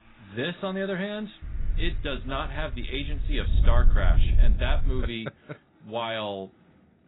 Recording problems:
garbled, watery; badly; nothing above 4 kHz
wind noise on the microphone; occasional gusts; from 1.5 to 5 s; 15 dB below the speech
traffic noise; faint; throughout; 25 dB below the speech

